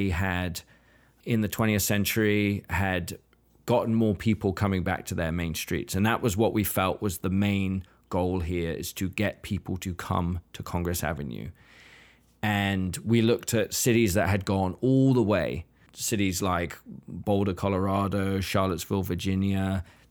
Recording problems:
abrupt cut into speech; at the start

